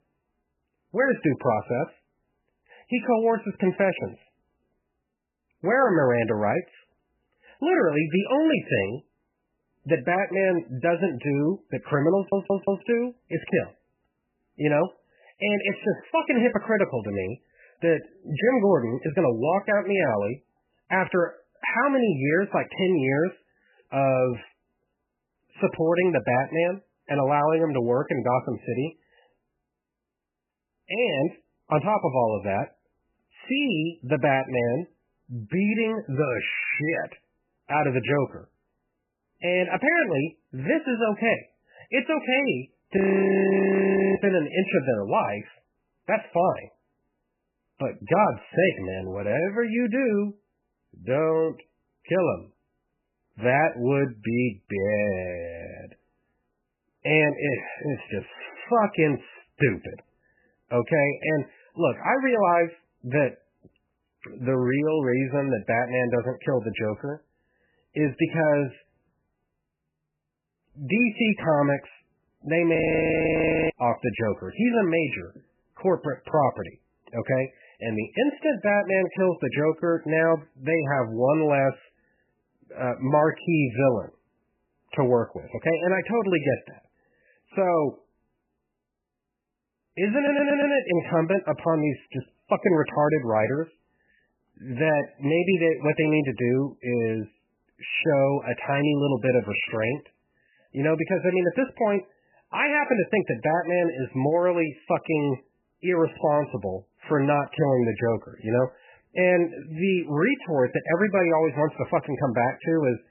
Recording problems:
garbled, watery; badly; nothing above 3 kHz
audio stuttering; at 12 s and at 1:30
audio freezing; at 43 s for 1 s and at 1:13 for 1 s

